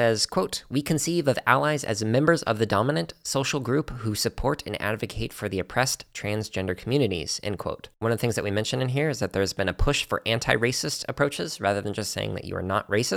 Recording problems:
abrupt cut into speech; at the start and the end

